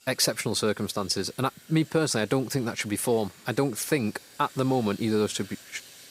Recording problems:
household noises; faint; throughout; 20 dB below the speech

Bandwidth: 15.5 kHz